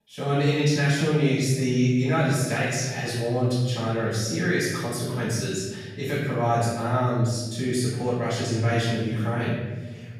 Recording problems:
room echo; strong; dies away in 1.4 s
off-mic speech; far

